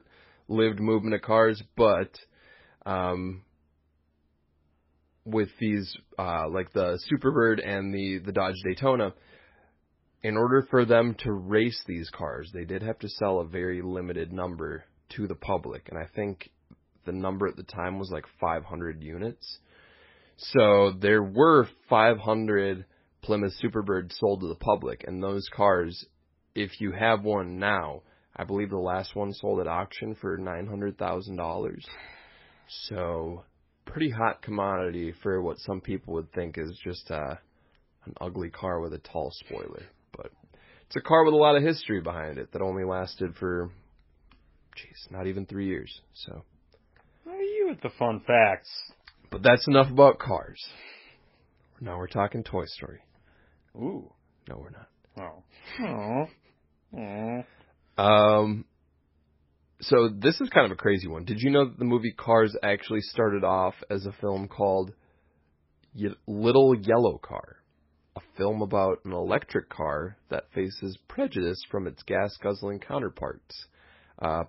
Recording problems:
garbled, watery; badly; nothing above 5.5 kHz

